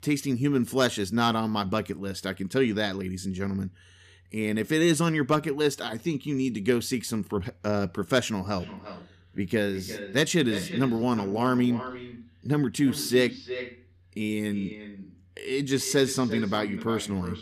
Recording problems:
echo of what is said; noticeable; from 8.5 s on; 350 ms later, 10 dB below the speech

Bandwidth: 14.5 kHz